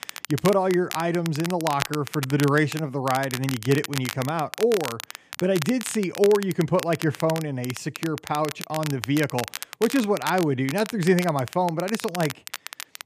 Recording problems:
crackle, like an old record; noticeable; 10 dB below the speech

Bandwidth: 14.5 kHz